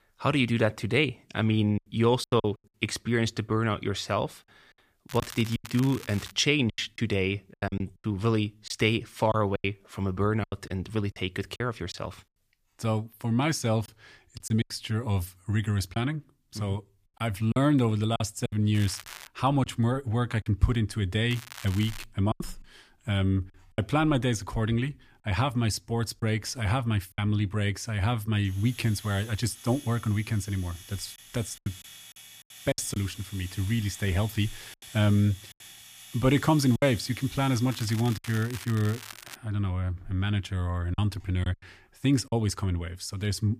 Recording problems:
household noises; noticeable; throughout; 15 dB below the speech
crackling; noticeable; 4 times, first at 5 s; 15 dB below the speech
choppy; very; 6% of the speech affected

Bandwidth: 15 kHz